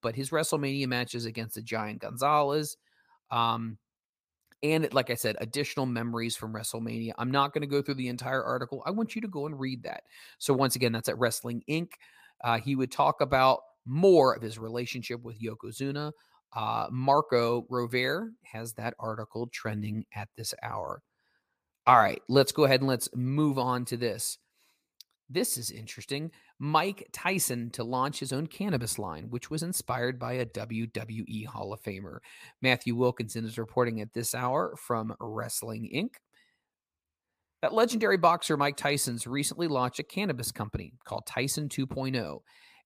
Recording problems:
none

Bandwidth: 15 kHz